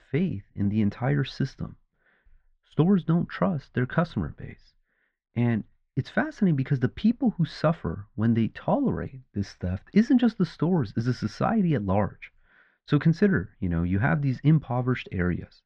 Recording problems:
muffled; very; fading above 1.5 kHz

